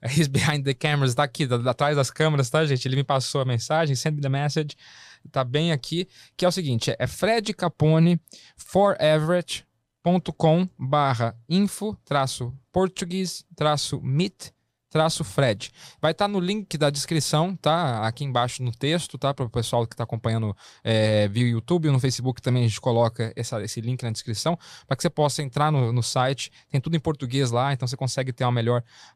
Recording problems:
none

